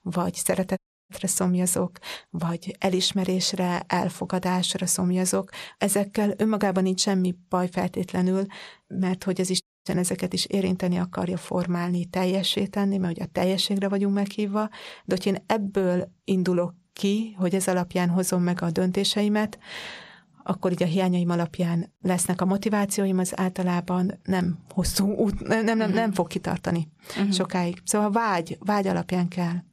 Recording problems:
audio cutting out; at 1 s and at 9.5 s

